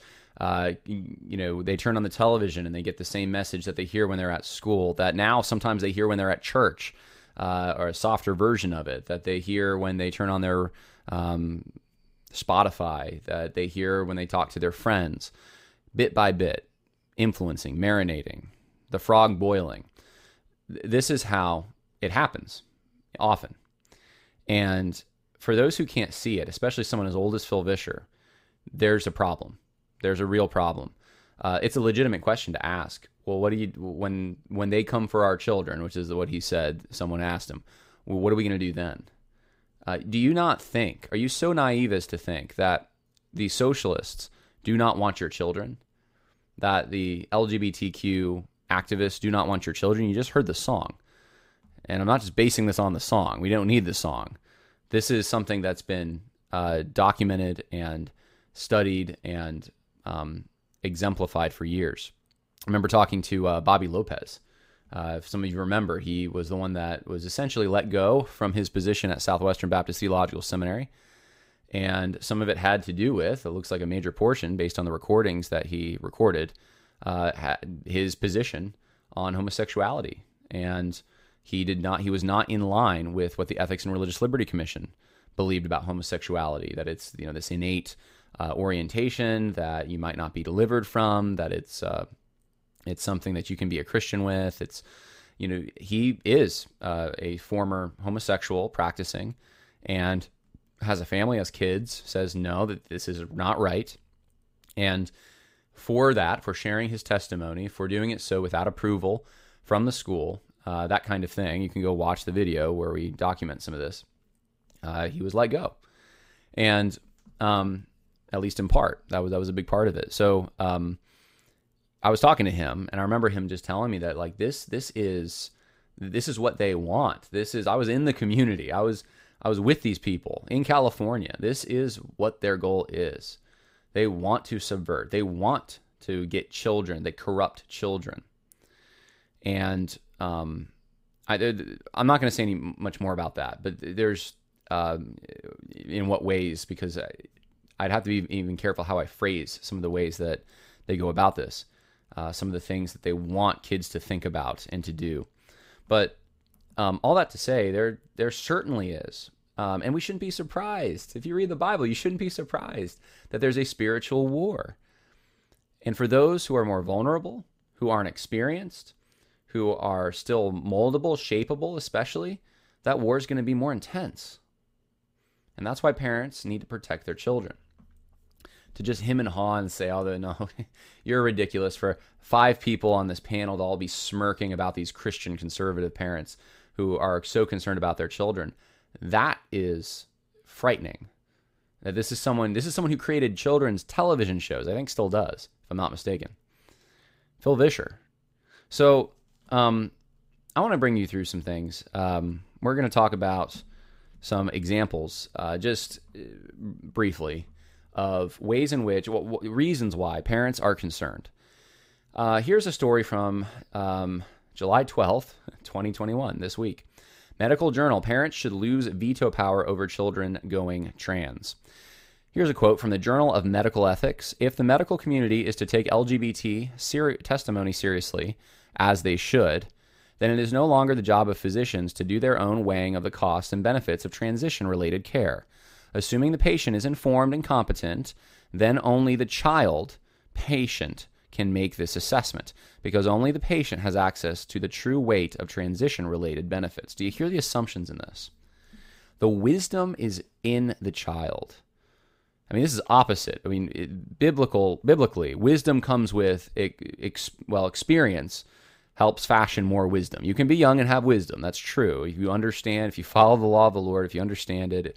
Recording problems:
none

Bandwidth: 15.5 kHz